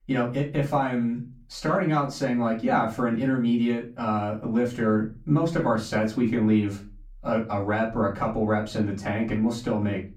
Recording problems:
off-mic speech; far
room echo; slight; dies away in 0.3 s

